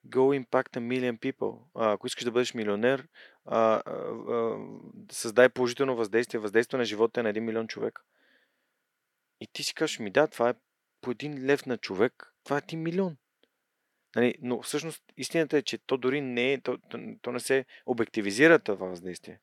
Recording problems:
thin; somewhat; fading below 400 Hz

